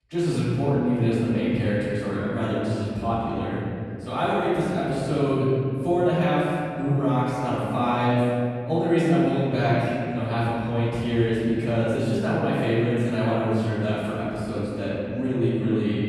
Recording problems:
room echo; strong; dies away in 2.4 s
off-mic speech; far

